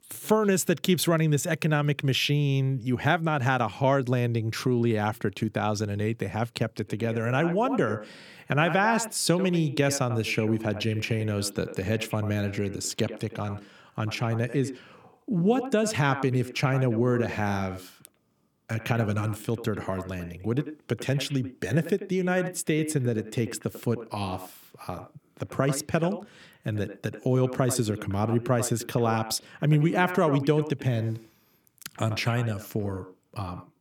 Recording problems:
echo of what is said; noticeable; from 7 s on; 90 ms later, 15 dB below the speech

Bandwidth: 18.5 kHz